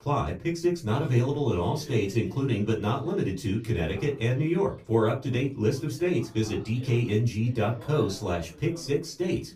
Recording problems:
off-mic speech; far
room echo; very slight; dies away in 0.2 s
voice in the background; faint; throughout; 20 dB below the speech

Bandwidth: 15 kHz